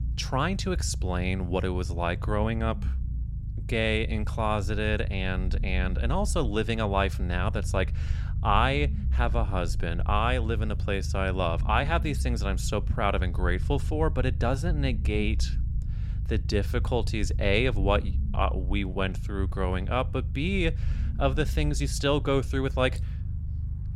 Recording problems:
low rumble; noticeable; throughout; 20 dB below the speech

